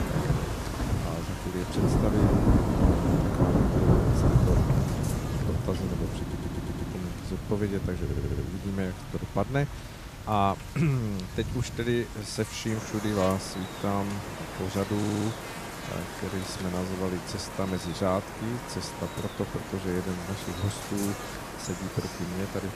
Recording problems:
rain or running water; very loud; throughout; 1 dB above the speech
electrical hum; loud; throughout; 50 Hz, 9 dB below the speech
audio stuttering; at 6 s, at 8 s and at 15 s

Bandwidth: 14.5 kHz